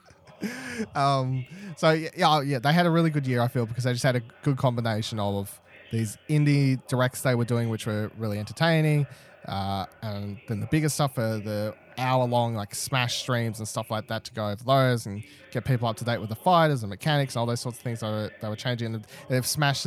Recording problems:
background chatter; faint; throughout; 2 voices, 25 dB below the speech
abrupt cut into speech; at the end

